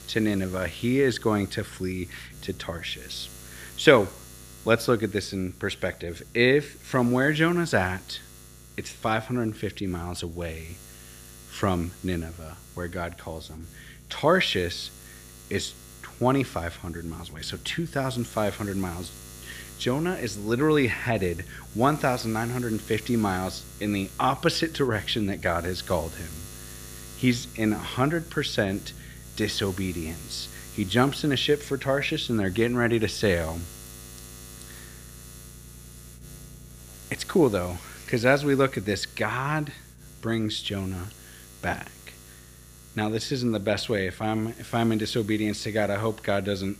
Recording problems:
electrical hum; faint; throughout; 60 Hz, 20 dB below the speech

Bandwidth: 15 kHz